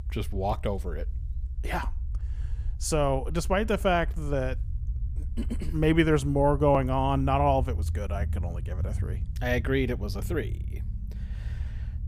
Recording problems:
low rumble; faint; throughout; 25 dB below the speech

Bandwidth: 15.5 kHz